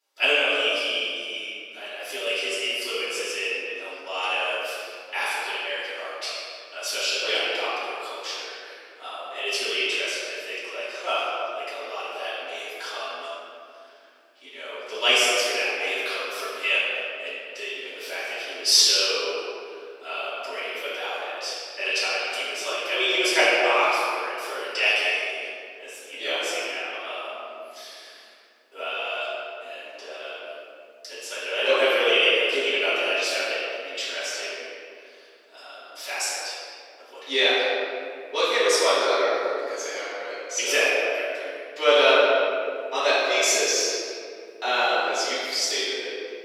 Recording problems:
room echo; strong; dies away in 2.2 s
off-mic speech; far
thin; very; fading below 400 Hz

